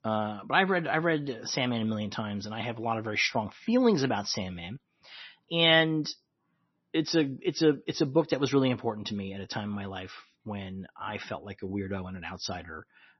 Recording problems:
garbled, watery; slightly; nothing above 6 kHz

